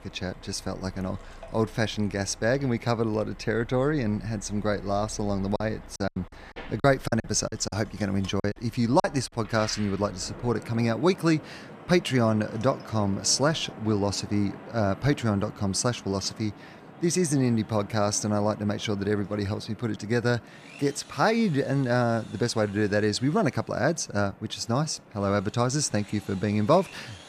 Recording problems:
machinery noise; faint; throughout; 25 dB below the speech
traffic noise; faint; throughout; 20 dB below the speech
choppy; very; from 5.5 to 9 s; 15% of the speech affected

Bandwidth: 14.5 kHz